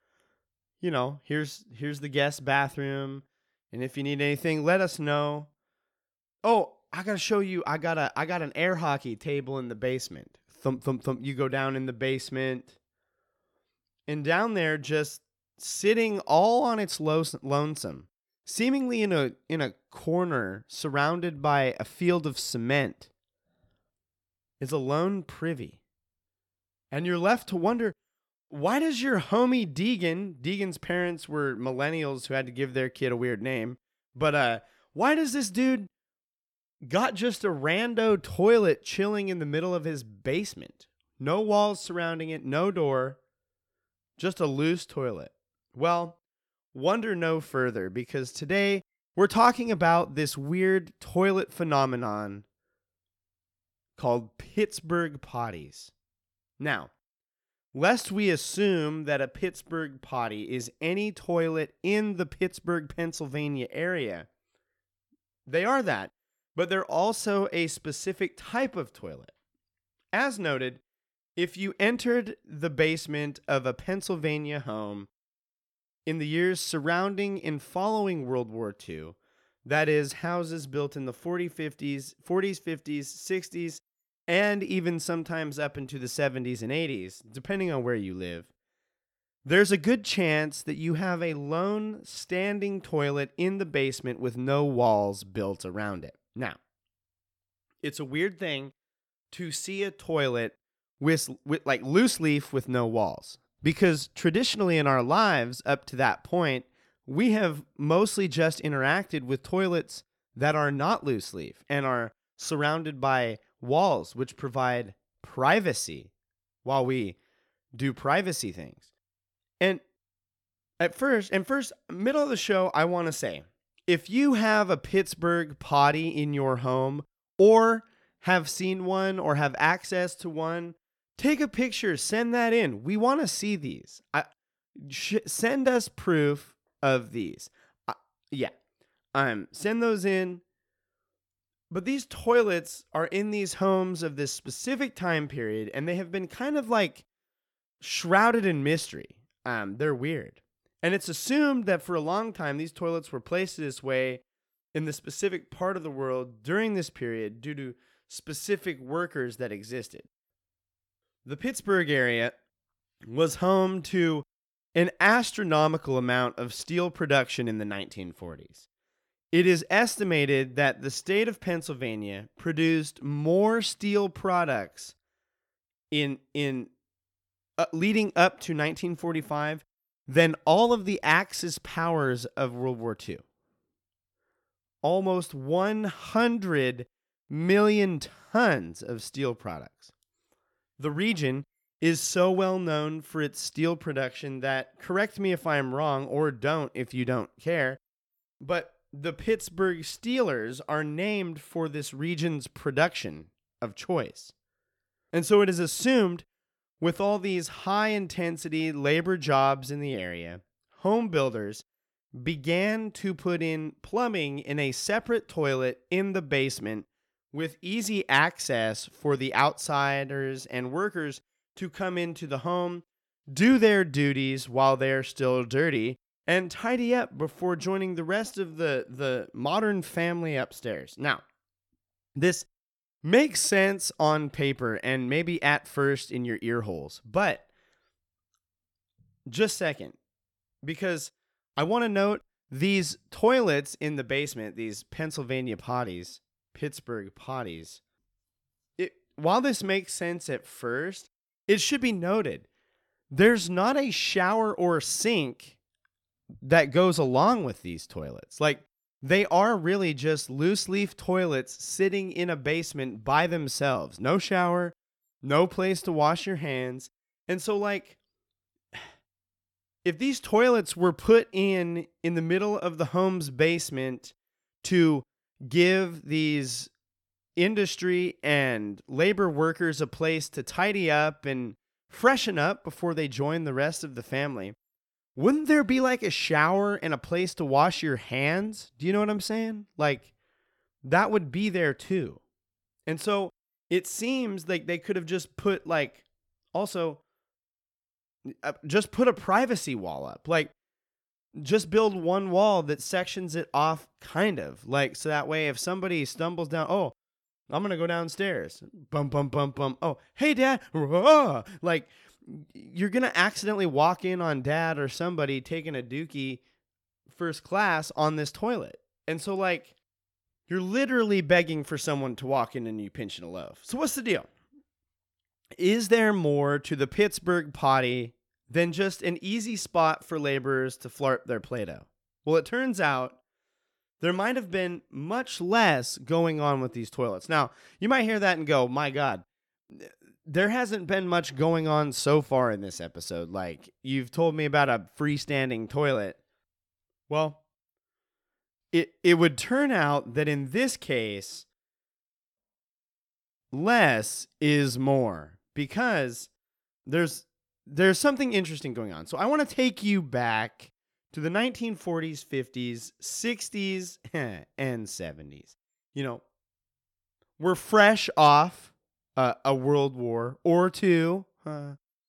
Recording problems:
none

